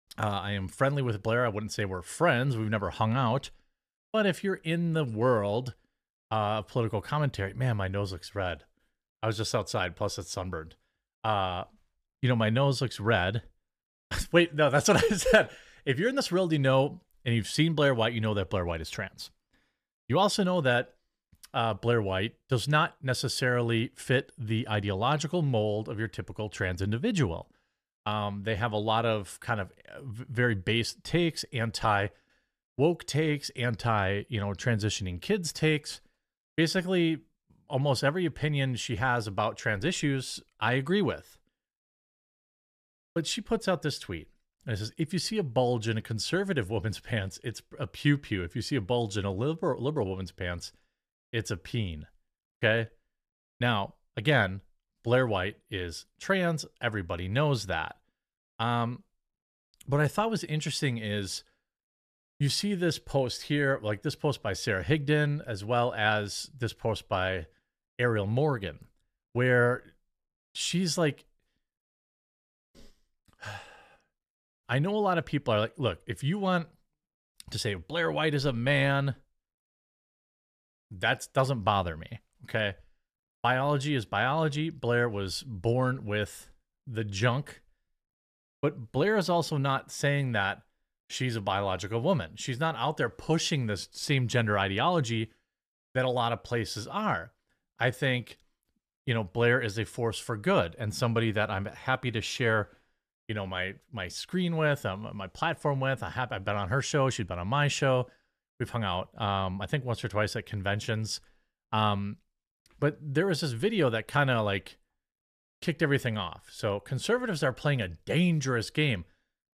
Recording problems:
none

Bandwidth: 14.5 kHz